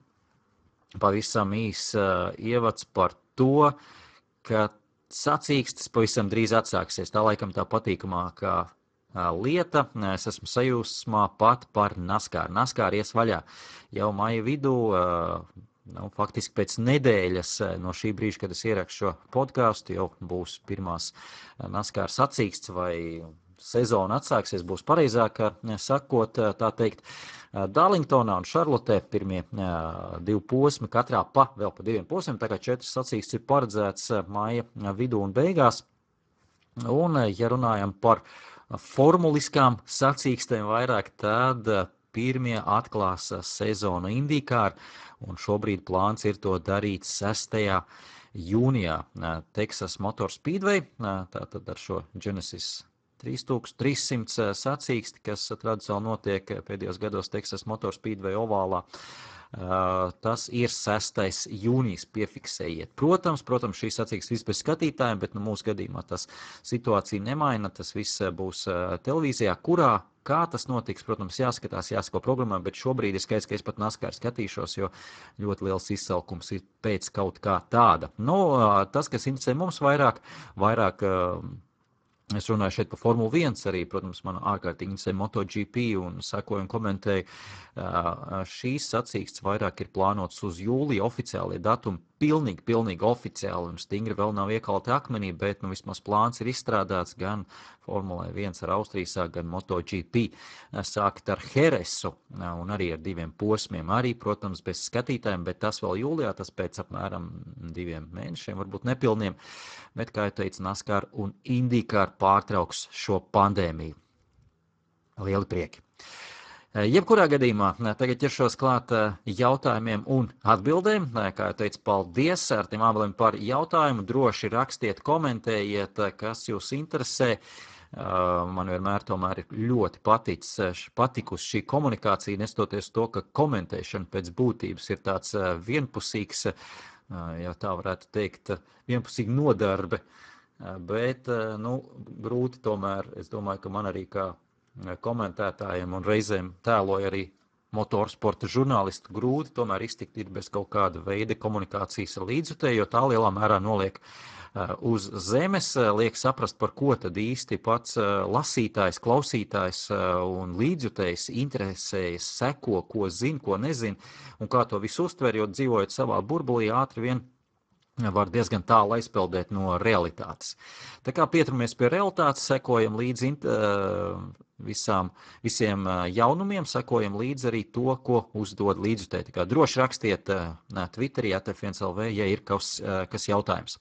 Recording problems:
garbled, watery; badly; nothing above 8 kHz

